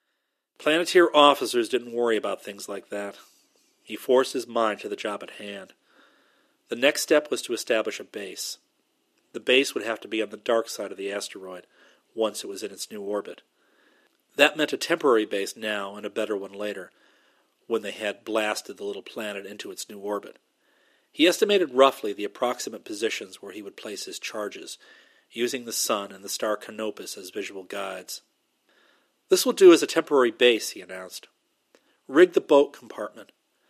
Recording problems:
thin; somewhat; fading below 300 Hz

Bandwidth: 14.5 kHz